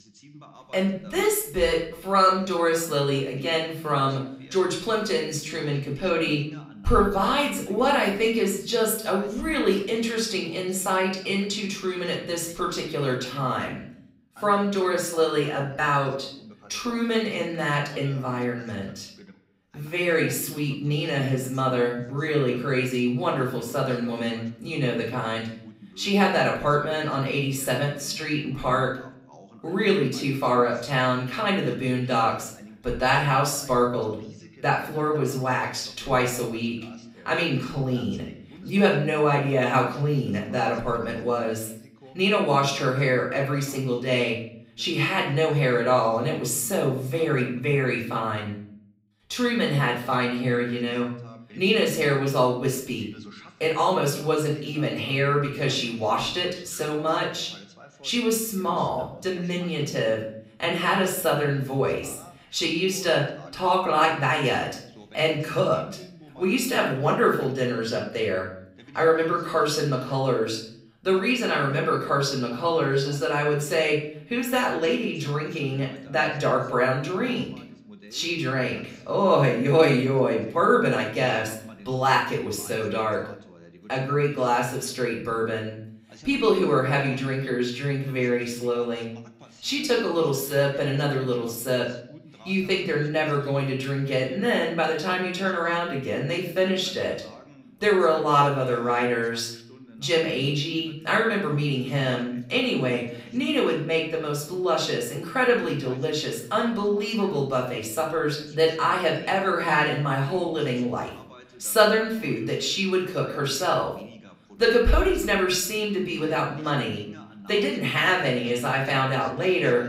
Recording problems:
off-mic speech; far
room echo; slight; dies away in 0.5 s
voice in the background; faint; throughout; 25 dB below the speech

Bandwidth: 15.5 kHz